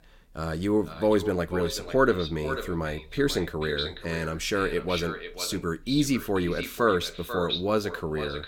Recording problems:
echo of what is said; strong; throughout; 490 ms later, 9 dB below the speech

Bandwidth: 17 kHz